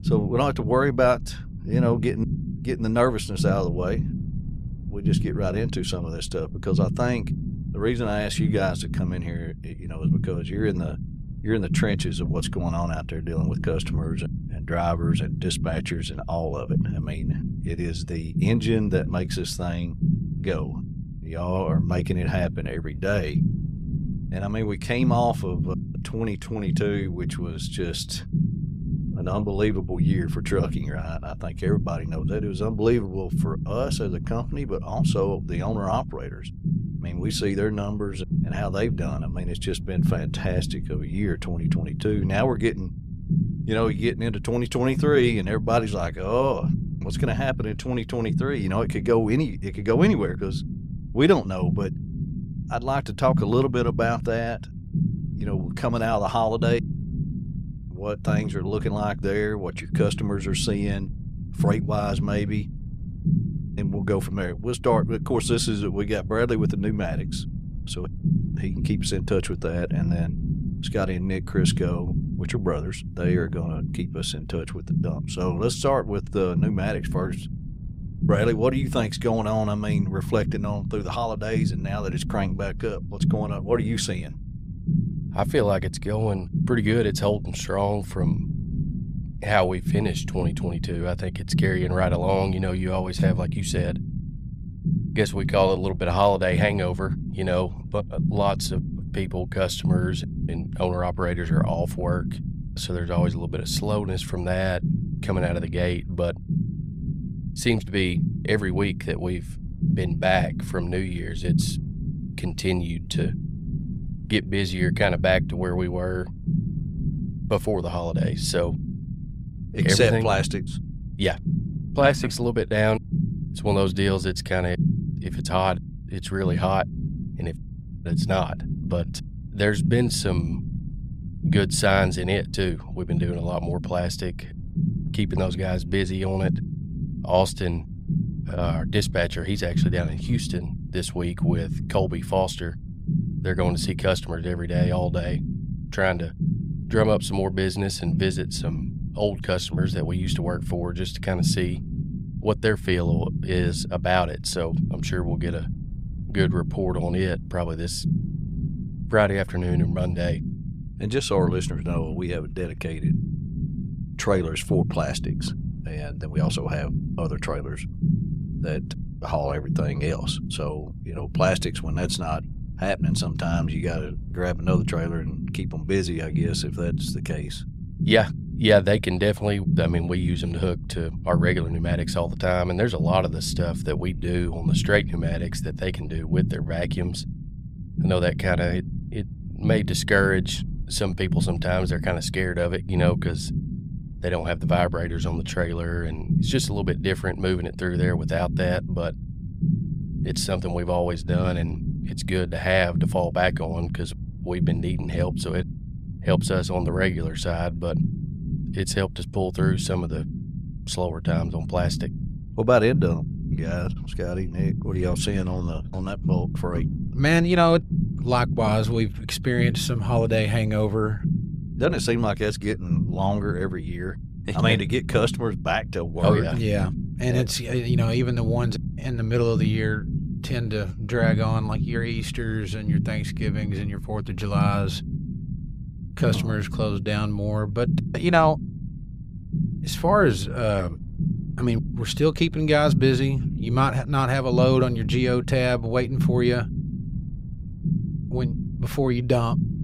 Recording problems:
low rumble; noticeable; throughout; 10 dB below the speech

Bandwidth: 15.5 kHz